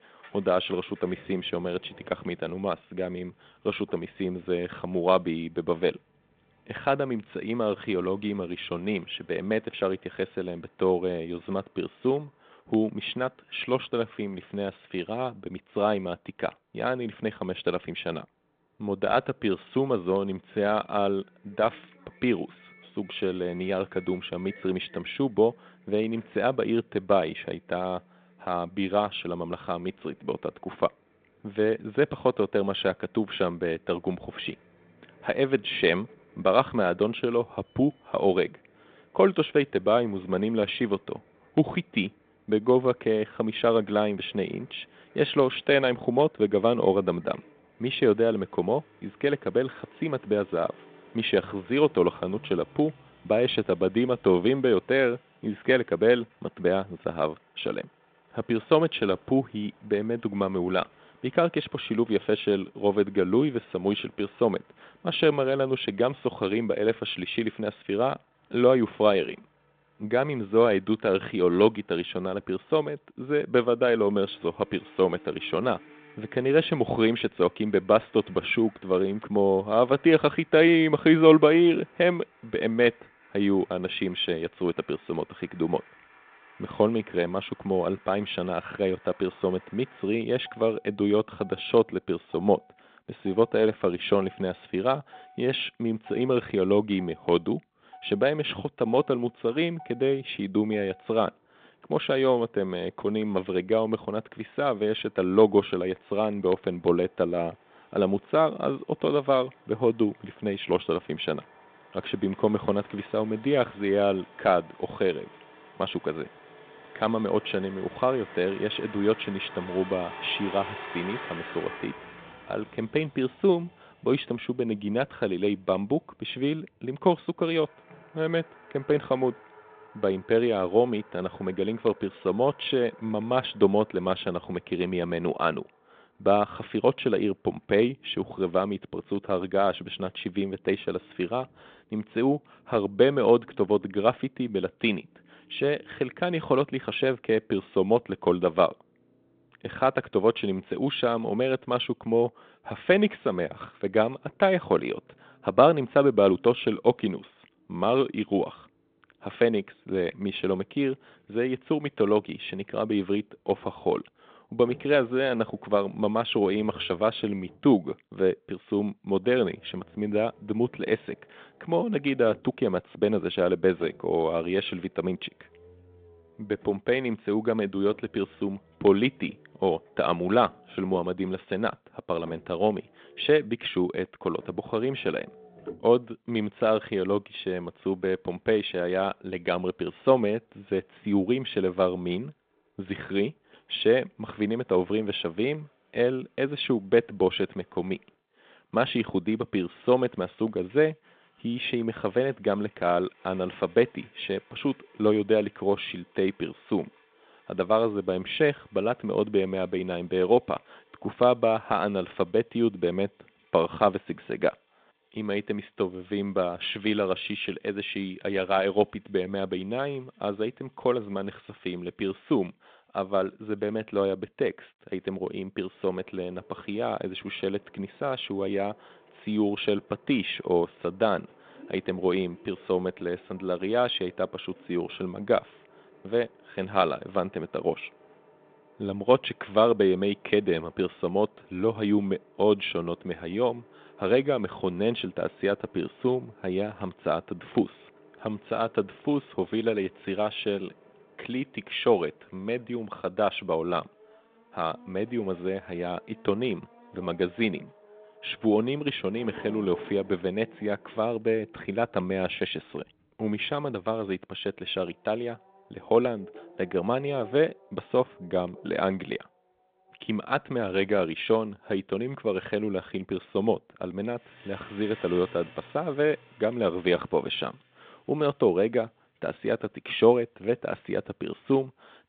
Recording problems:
phone-call audio
traffic noise; faint; throughout; 25 dB below the speech

